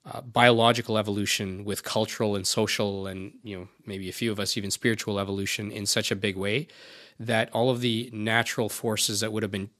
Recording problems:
none

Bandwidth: 14.5 kHz